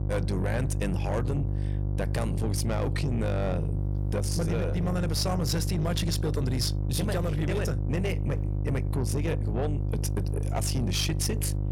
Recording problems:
distortion; slight; 10 dB below the speech
electrical hum; loud; throughout; 50 Hz, 8 dB below the speech

